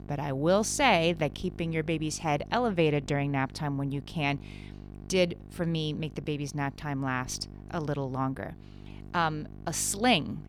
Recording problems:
electrical hum; faint; throughout; 50 Hz, 25 dB below the speech

